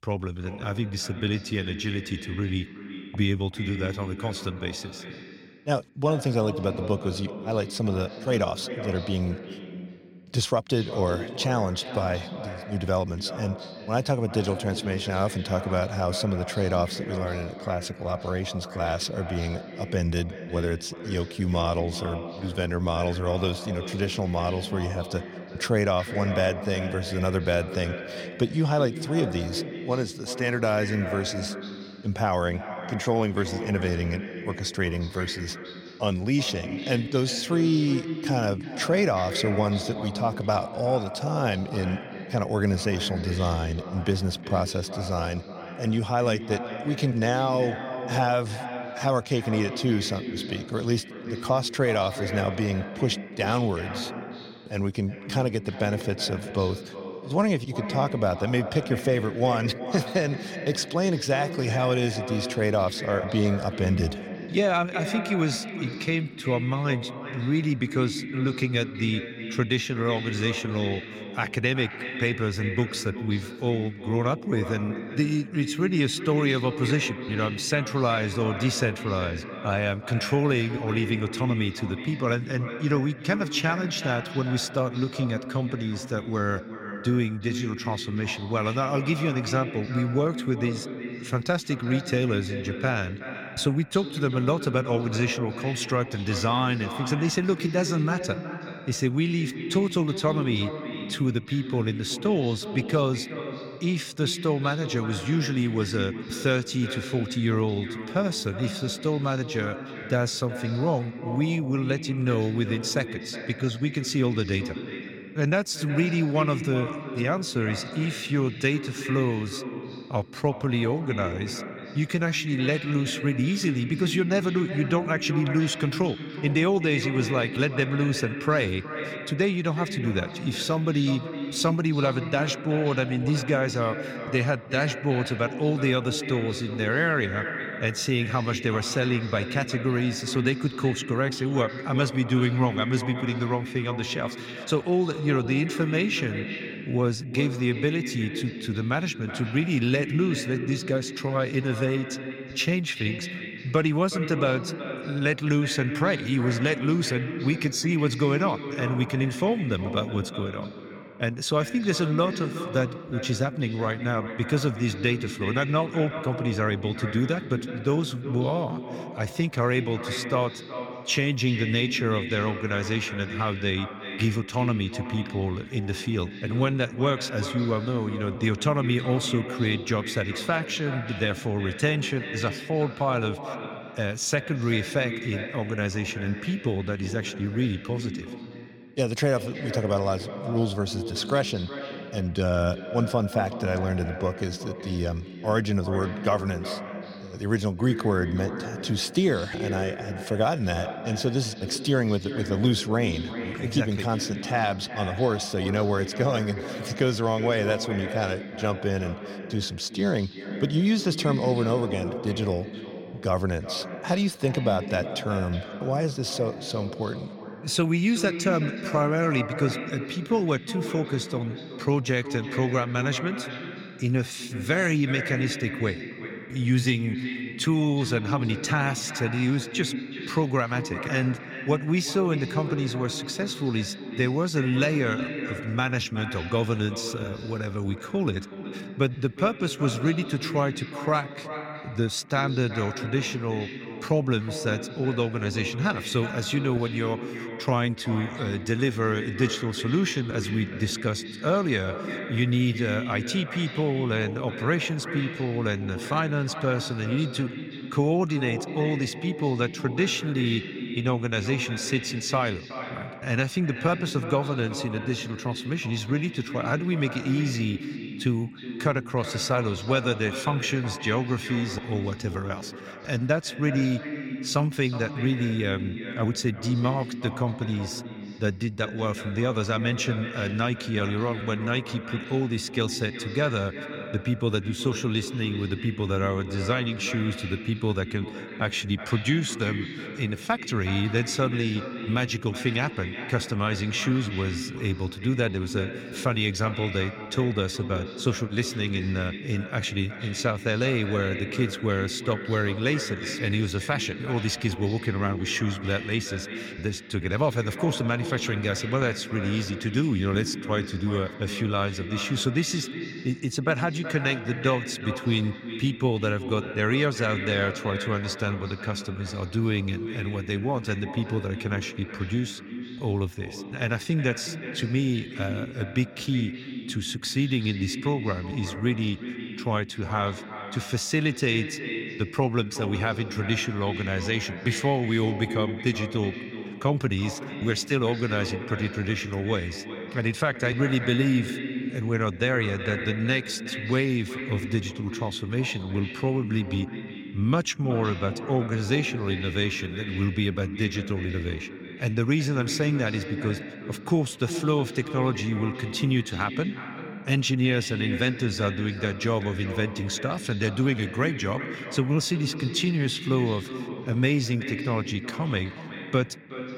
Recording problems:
echo of what is said; strong; throughout; 370 ms later, 9 dB below the speech

